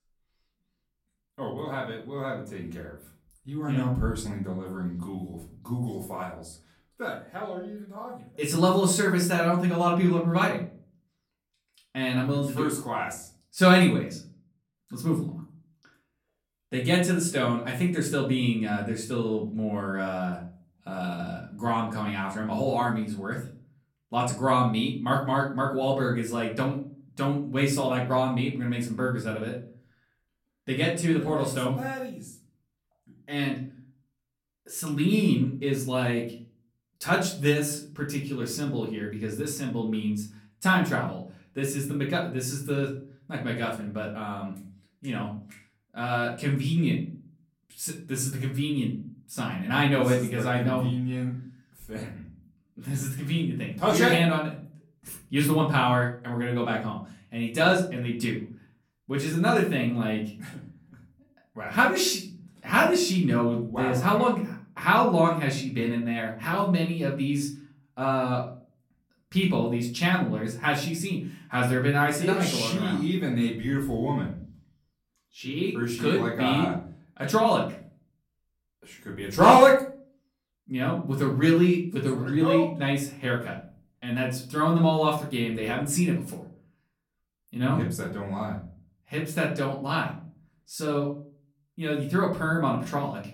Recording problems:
off-mic speech; far
room echo; slight; dies away in 0.4 s

